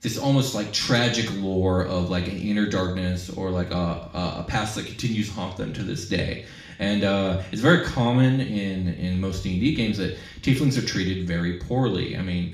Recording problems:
off-mic speech; far
room echo; noticeable; dies away in 0.5 s

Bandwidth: 14.5 kHz